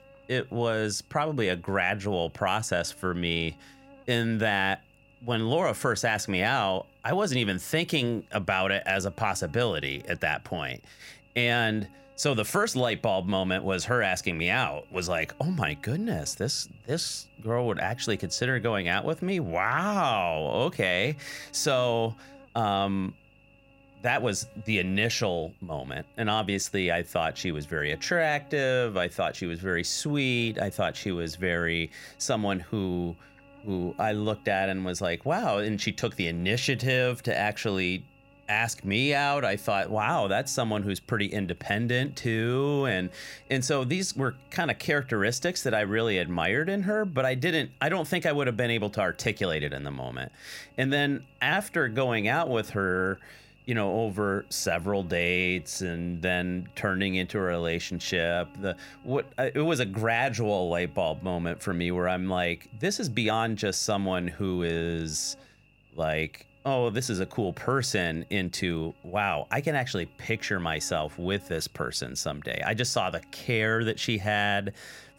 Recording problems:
electrical hum; faint; throughout; 50 Hz, 30 dB below the speech

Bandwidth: 16 kHz